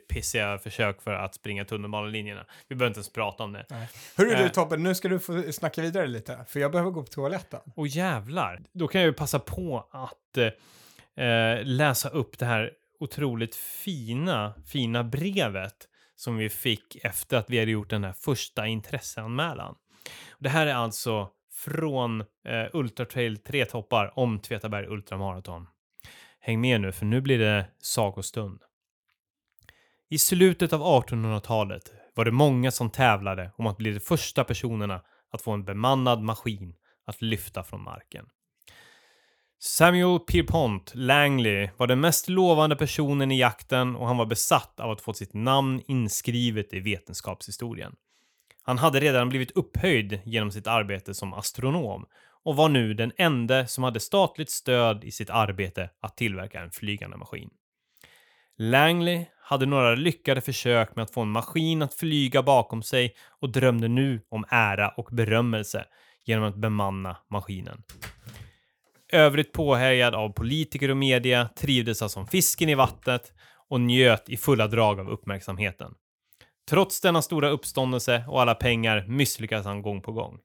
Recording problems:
none

